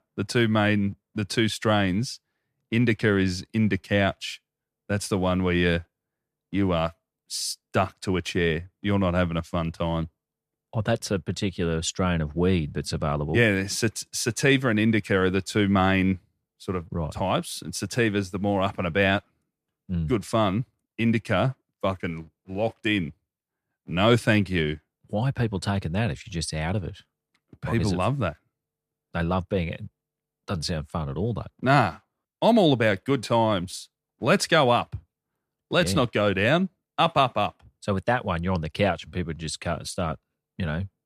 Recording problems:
none

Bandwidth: 14.5 kHz